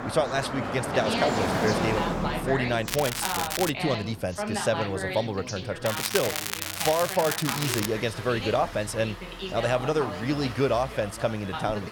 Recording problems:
traffic noise; loud; throughout; 5 dB below the speech
background chatter; loud; throughout; 2 voices, 7 dB below the speech
crackling; loud; at 3 s and from 6 to 8 s; 2 dB below the speech

